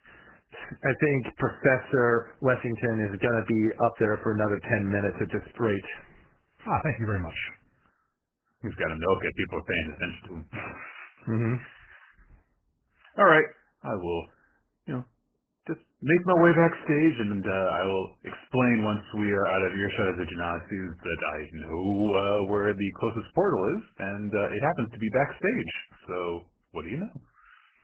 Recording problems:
garbled, watery; badly; nothing above 3 kHz

